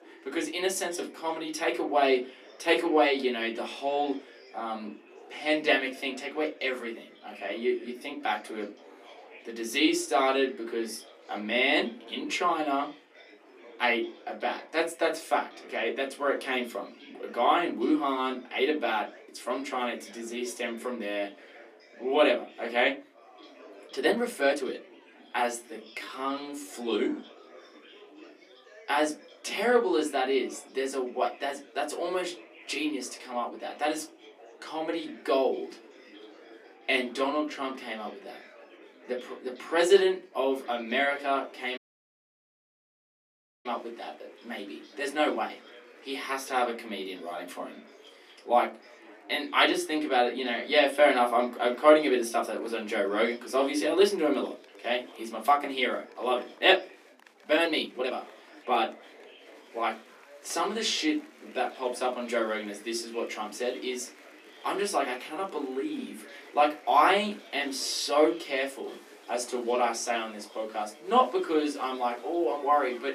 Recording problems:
off-mic speech; far
thin; somewhat; fading below 250 Hz
room echo; very slight; dies away in 0.2 s
chatter from many people; faint; throughout; 20 dB below the speech
uneven, jittery; strongly; from 24 to 58 s
audio cutting out; at 42 s for 2 s

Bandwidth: 14.5 kHz